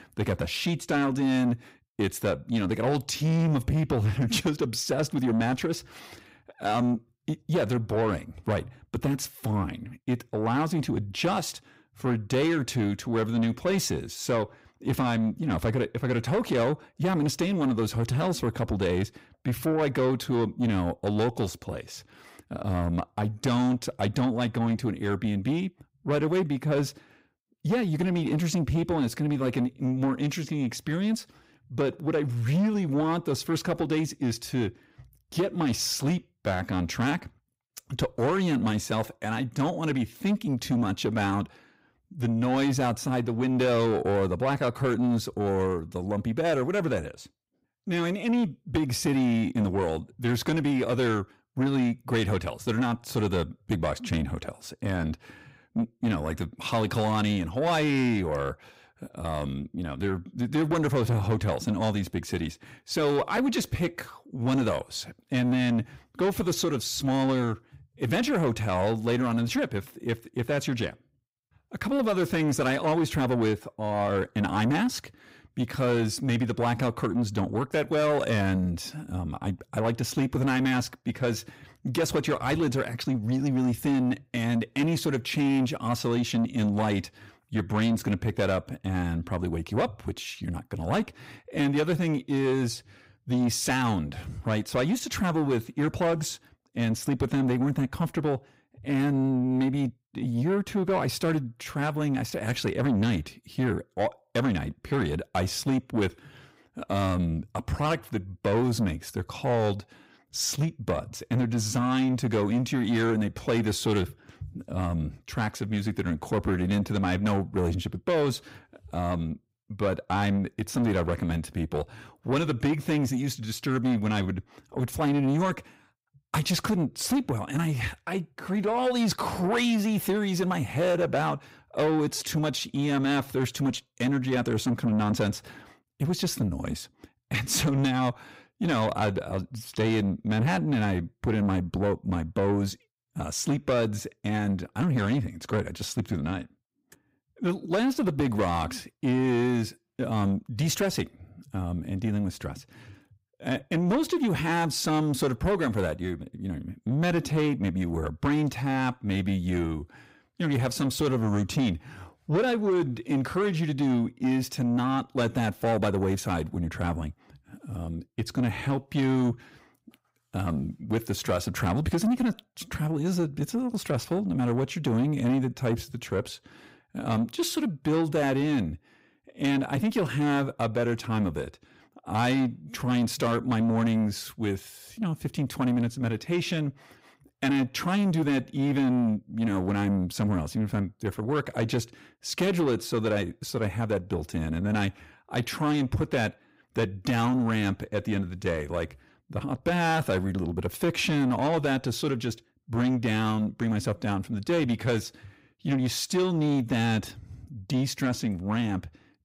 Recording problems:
distortion; slight; 10 dB below the speech

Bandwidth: 15.5 kHz